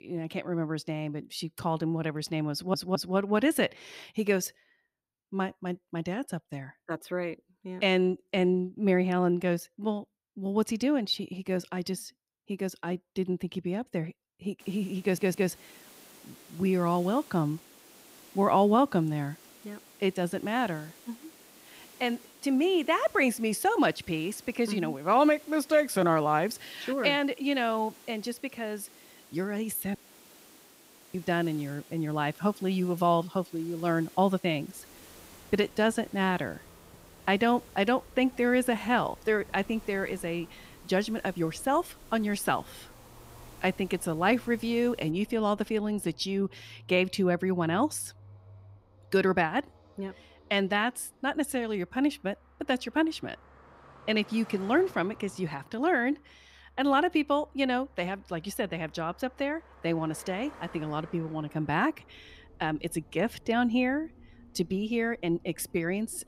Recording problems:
traffic noise; faint; from 35 s on; 25 dB below the speech
hiss; faint; from 15 to 45 s; 25 dB below the speech
audio stuttering; at 2.5 s and at 15 s
audio cutting out; at 30 s for 1 s

